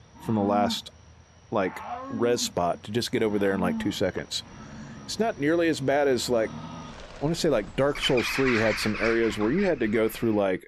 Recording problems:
animal sounds; loud; throughout; 9 dB below the speech

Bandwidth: 13.5 kHz